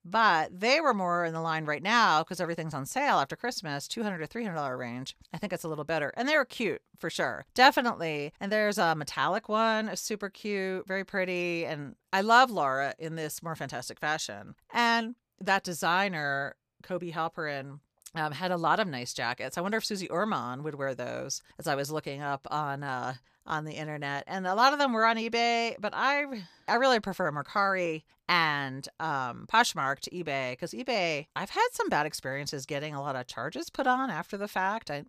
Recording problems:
none

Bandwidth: 14.5 kHz